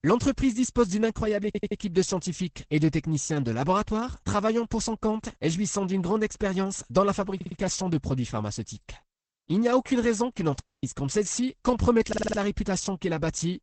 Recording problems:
garbled, watery; badly; nothing above 8 kHz
audio stuttering; at 1.5 s, at 7.5 s and at 12 s
audio cutting out; at 11 s

